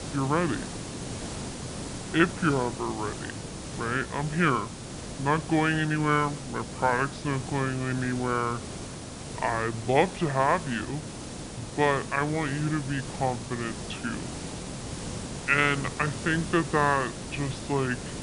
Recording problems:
wrong speed and pitch; too slow and too low; 0.7 times normal speed
high frequencies cut off; noticeable; nothing above 6 kHz
hiss; loud; throughout; 9 dB below the speech

